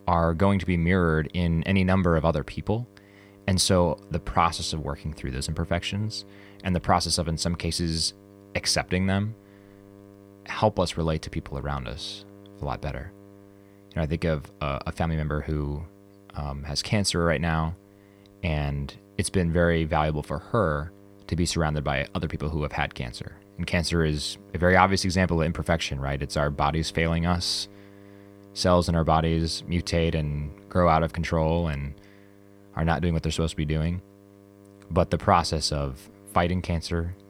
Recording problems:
electrical hum; faint; throughout; 50 Hz, 25 dB below the speech

